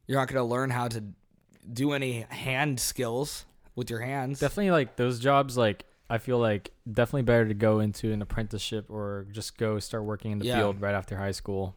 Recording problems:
none

